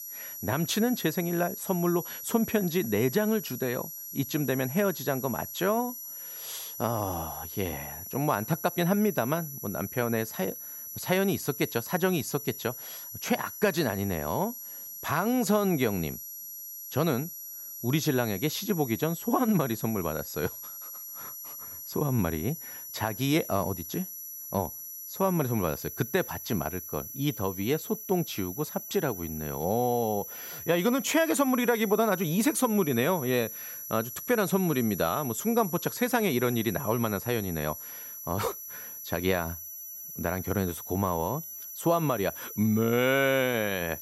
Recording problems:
high-pitched whine; loud; throughout; 11.5 kHz, 9 dB below the speech

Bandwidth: 16 kHz